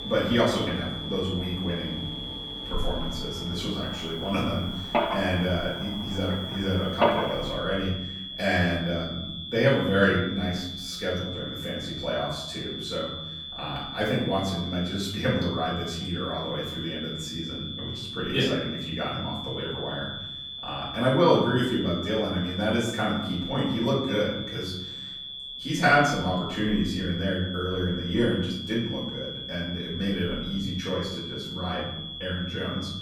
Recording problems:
off-mic speech; far
room echo; noticeable; dies away in 0.9 s
high-pitched whine; loud; throughout; 3.5 kHz, 7 dB below the speech
machinery noise; loud; until 7.5 s; 6 dB below the speech

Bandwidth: 17.5 kHz